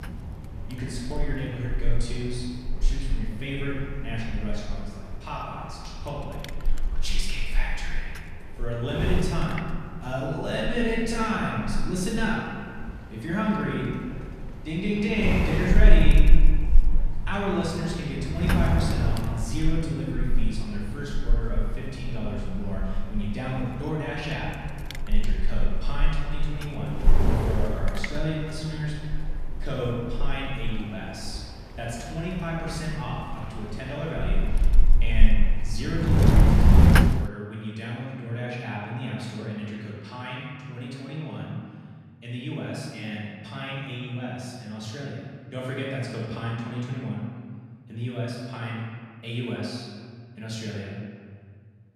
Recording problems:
off-mic speech; far
room echo; noticeable; dies away in 1.8 s
wind noise on the microphone; heavy; until 37 s; 3 dB below the speech

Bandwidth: 14 kHz